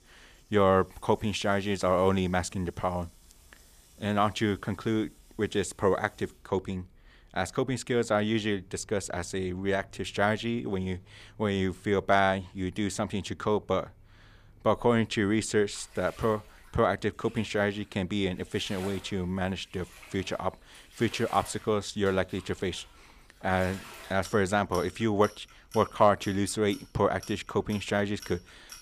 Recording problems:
household noises; faint; throughout; 25 dB below the speech

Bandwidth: 15 kHz